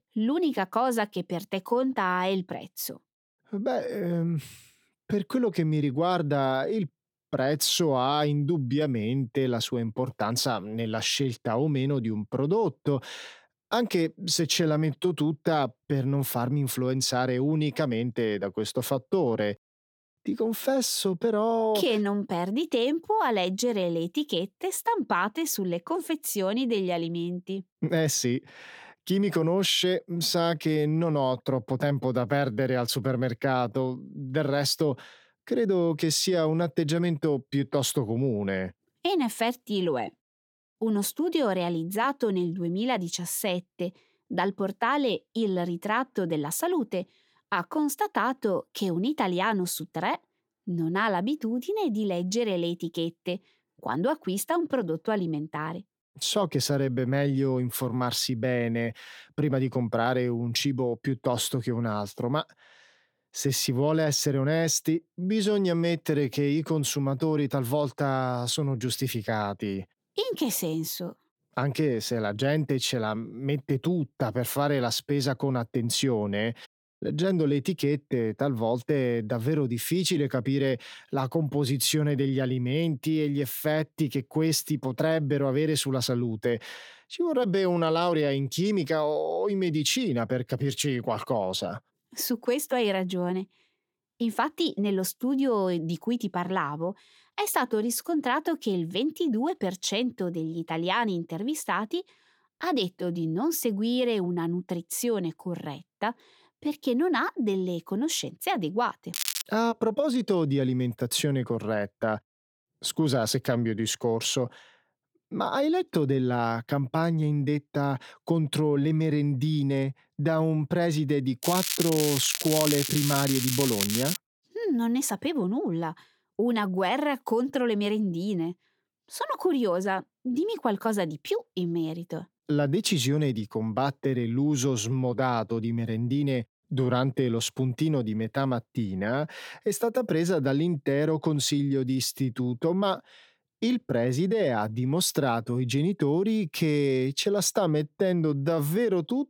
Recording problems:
crackling; loud; at 1:49 and from 2:01 to 2:04; 1 dB below the speech

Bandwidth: 17 kHz